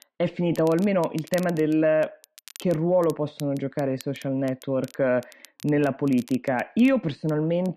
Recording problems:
muffled; slightly; fading above 3 kHz
crackle, like an old record; faint; 20 dB below the speech

